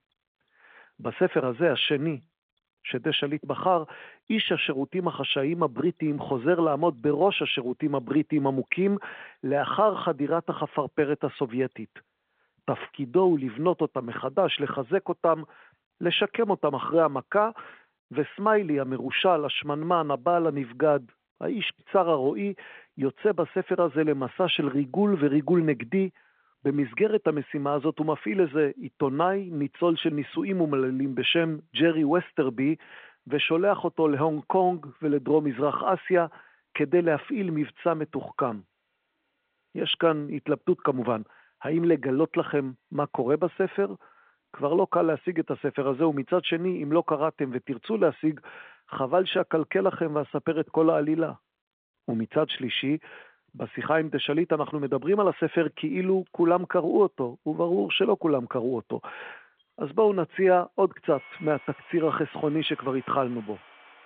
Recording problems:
phone-call audio; nothing above 3.5 kHz
machinery noise; faint; throughout; 25 dB below the speech

